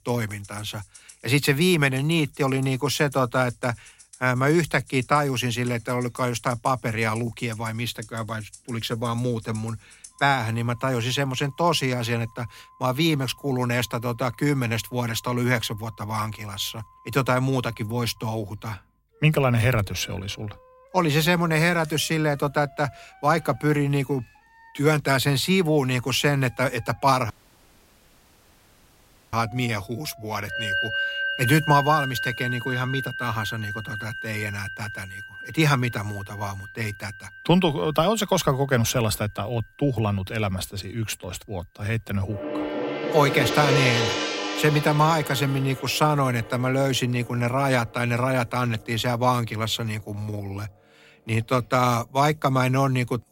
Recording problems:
background music; loud; throughout; 6 dB below the speech
audio cutting out; at 27 s for 2 s

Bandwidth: 16 kHz